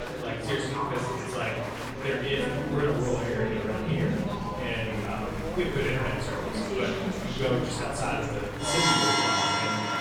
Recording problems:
off-mic speech; far
room echo; noticeable; dies away in 0.8 s
background music; very loud; throughout; 4 dB above the speech
murmuring crowd; loud; throughout; 3 dB below the speech

